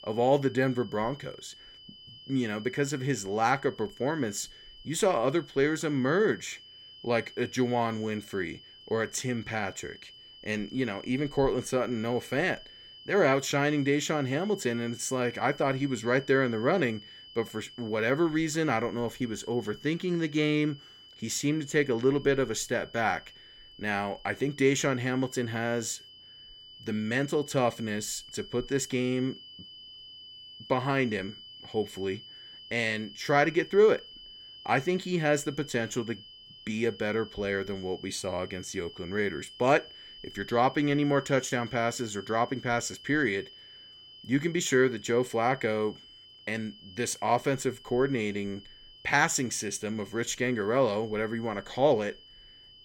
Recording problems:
high-pitched whine; noticeable; throughout; 3 kHz, 20 dB below the speech

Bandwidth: 16.5 kHz